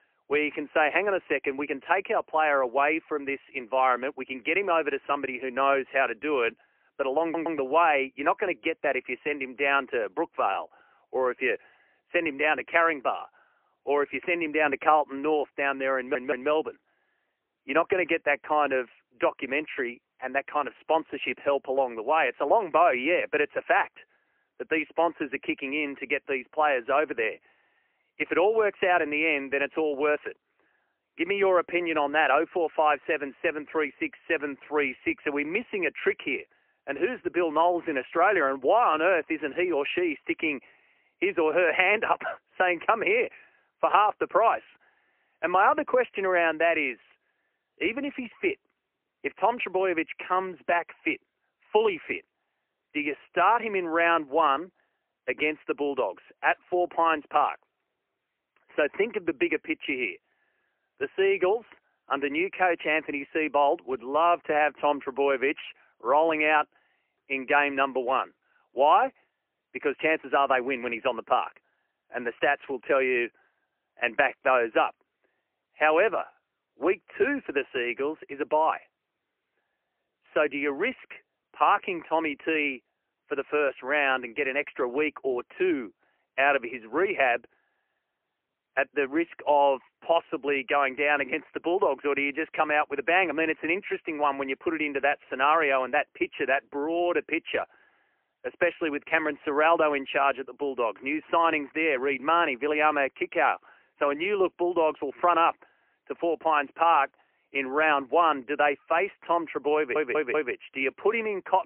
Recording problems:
phone-call audio; poor line; nothing above 3 kHz
muffled; very slightly; fading above 2.5 kHz
audio stuttering; at 7 s, at 16 s and at 1:50

